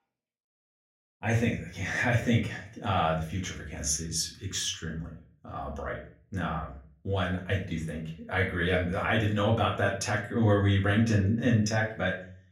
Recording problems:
off-mic speech; far
room echo; slight; dies away in 0.4 s

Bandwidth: 16 kHz